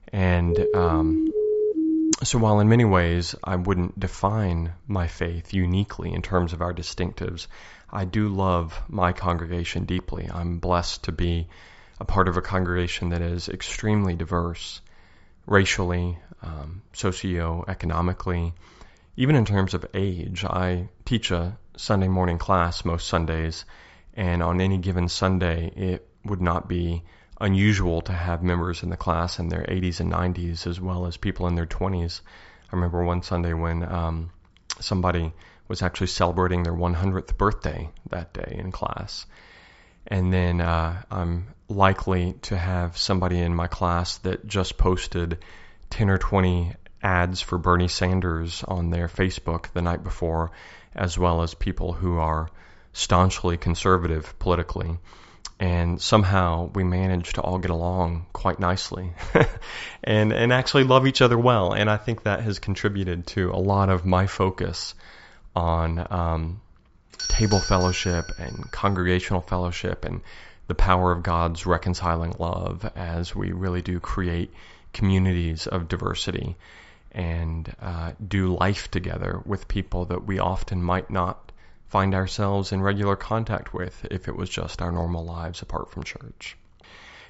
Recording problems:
high frequencies cut off; noticeable; nothing above 8 kHz
siren; loud; until 2 s; peak 2 dB above the speech
doorbell; noticeable; from 1:07 to 1:09; peak 1 dB below the speech

